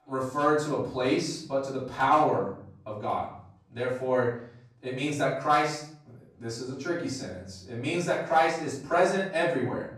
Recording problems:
off-mic speech; far
room echo; noticeable; dies away in 0.6 s

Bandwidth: 14.5 kHz